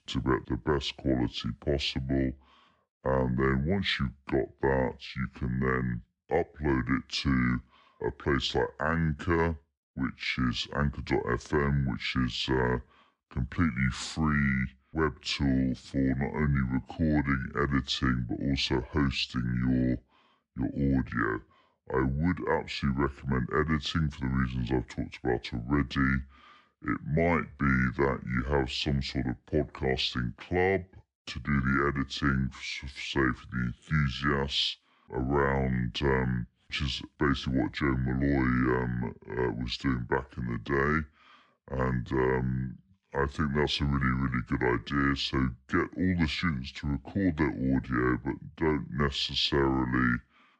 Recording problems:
wrong speed and pitch; too slow and too low; 0.7 times normal speed

